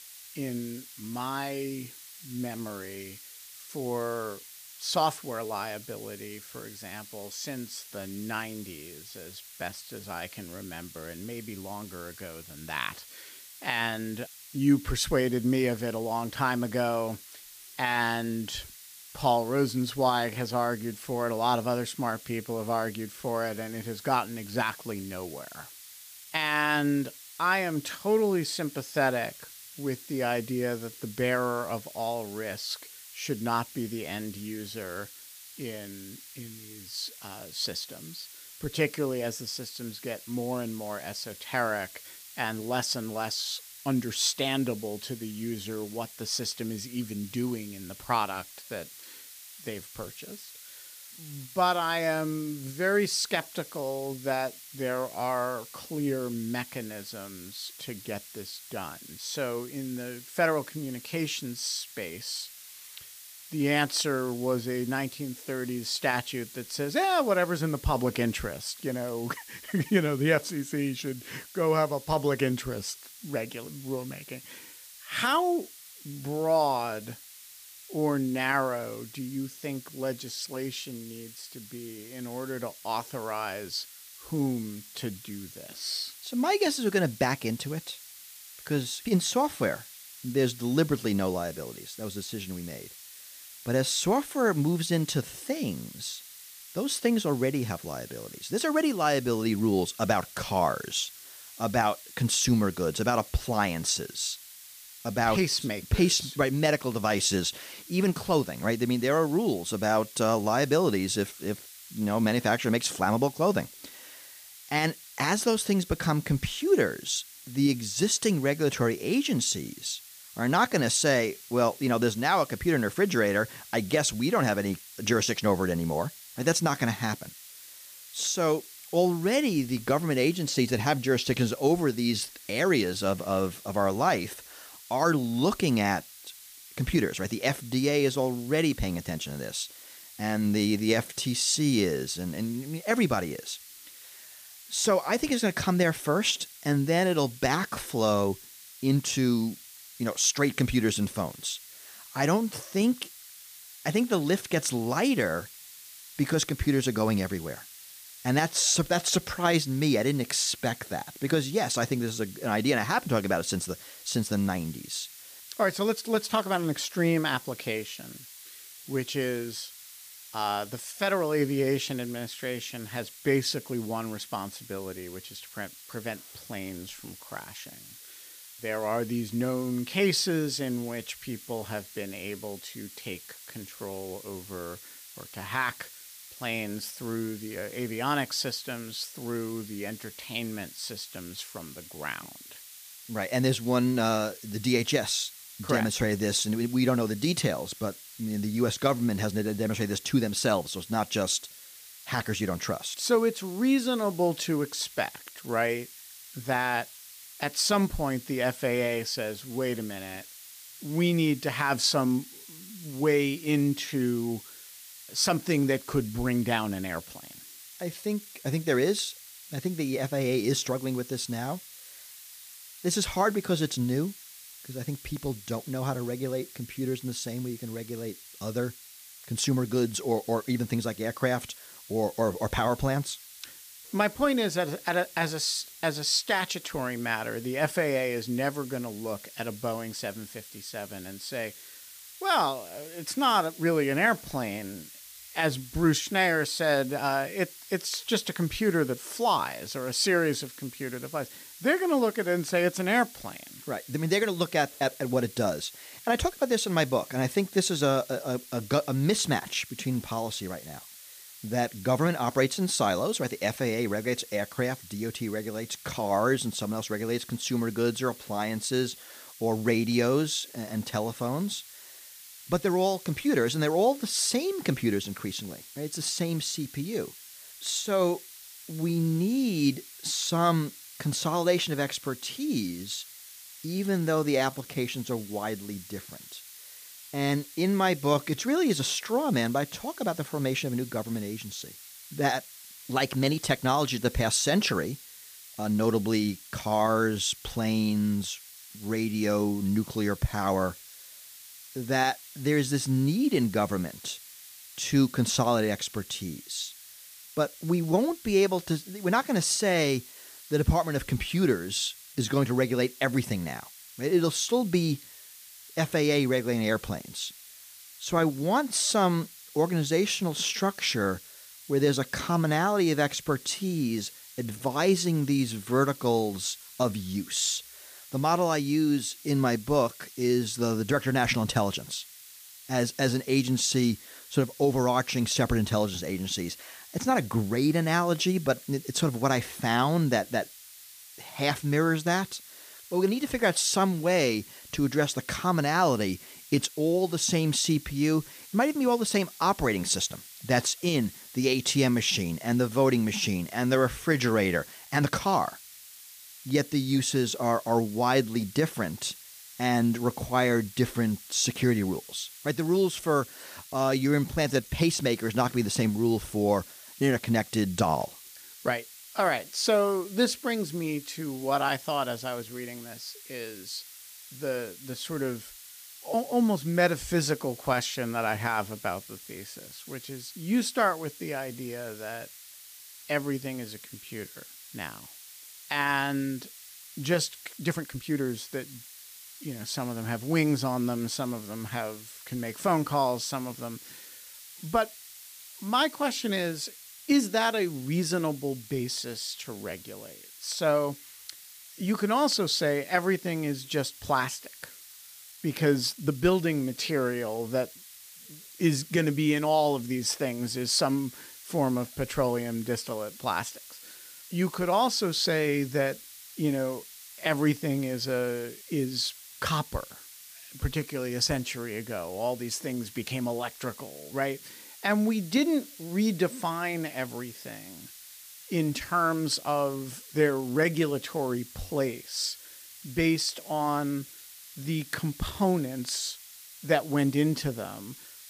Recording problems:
hiss; noticeable; throughout; 15 dB below the speech
uneven, jittery; strongly; from 26 s to 7:11

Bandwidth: 15 kHz